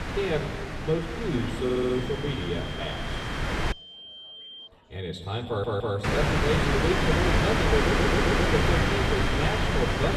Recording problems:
off-mic speech; far
room echo; noticeable; dies away in 2 s
wind noise on the microphone; heavy; until 3.5 s and from 6 s on; 3 dB above the speech
high-pitched whine; noticeable; from 1.5 to 4.5 s and from 7 s on; 3 kHz, 10 dB below the speech
chatter from many people; faint; throughout; 30 dB below the speech
audio stuttering; at 1.5 s, at 5.5 s and at 8 s

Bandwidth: 13.5 kHz